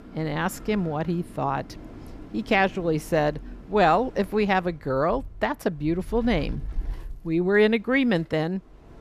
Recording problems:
wind in the background; noticeable; throughout; 15 dB below the speech

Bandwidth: 14.5 kHz